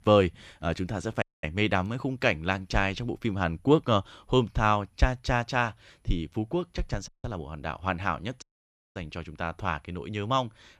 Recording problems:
audio cutting out; at 1 s, at 7 s and at 8.5 s for 0.5 s

